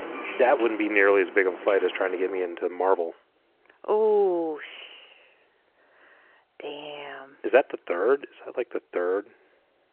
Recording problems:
phone-call audio
traffic noise; very faint; until 2.5 s; 15 dB below the speech

